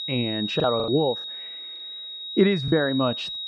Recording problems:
muffled; very; fading above 1.5 kHz
high-pitched whine; loud; throughout; 4 kHz, 7 dB below the speech
choppy; very; 8% of the speech affected

